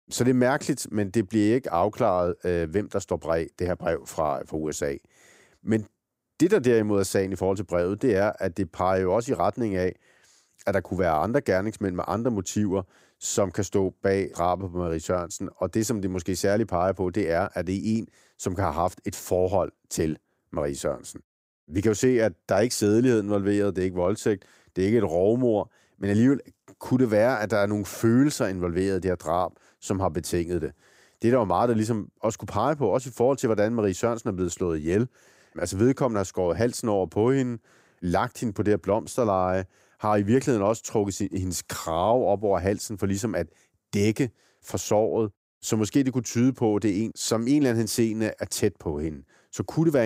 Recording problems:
abrupt cut into speech; at the end

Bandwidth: 15.5 kHz